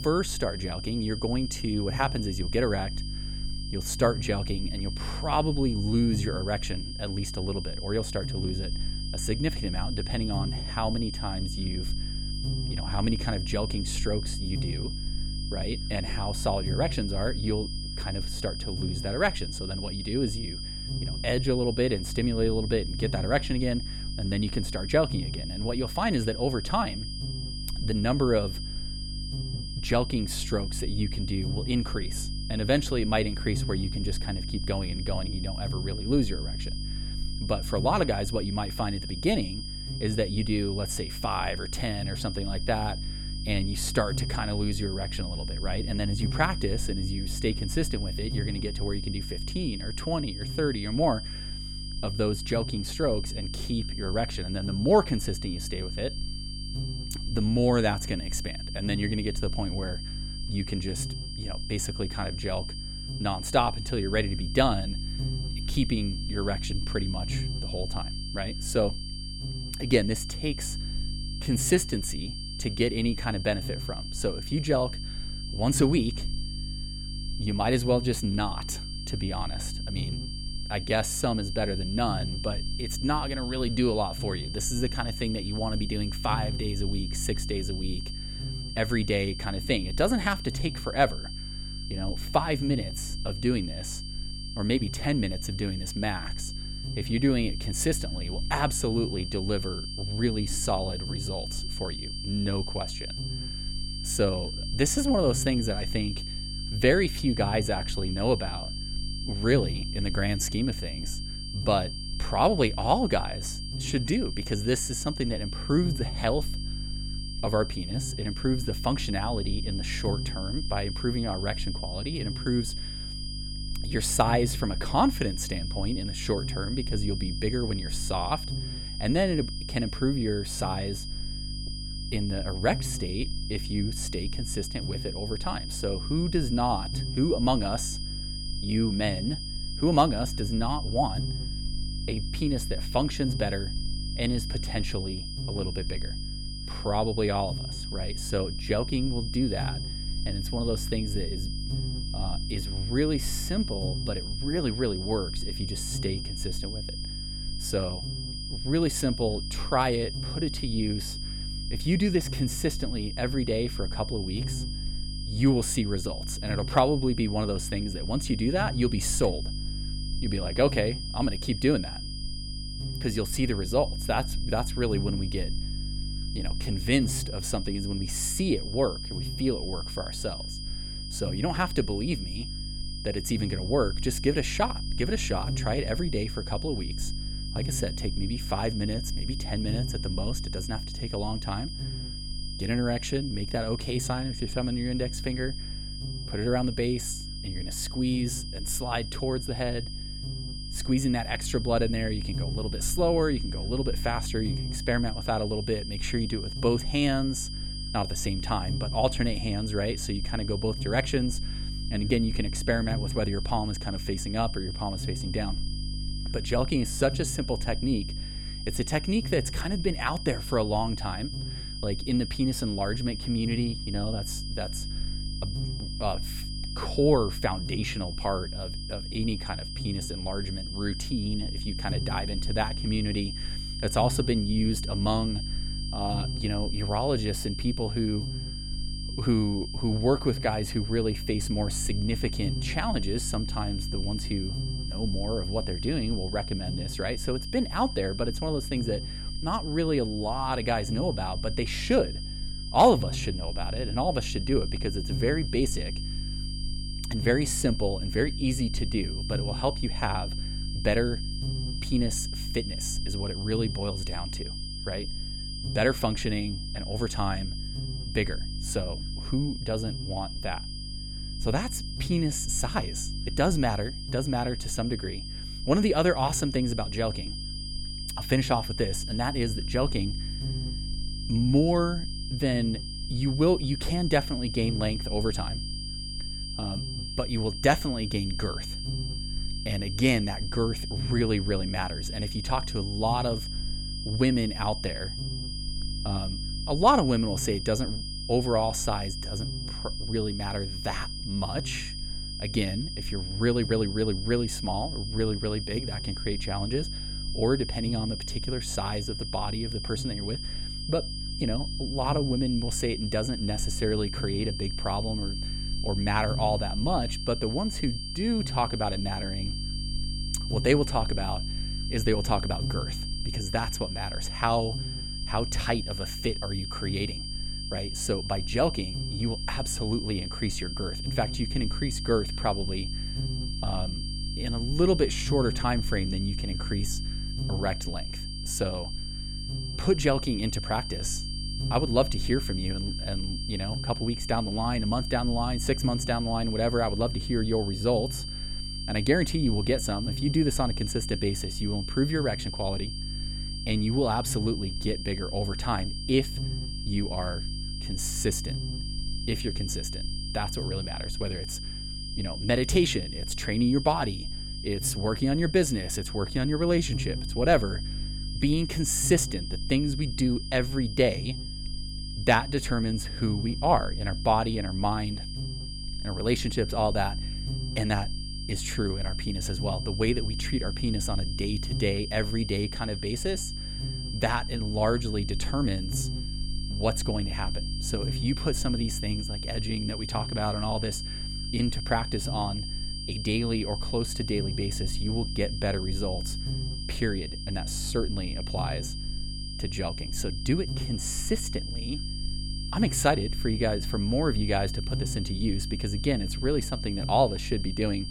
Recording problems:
high-pitched whine; loud; throughout; 5 kHz, 8 dB below the speech
electrical hum; noticeable; throughout; 50 Hz, 20 dB below the speech

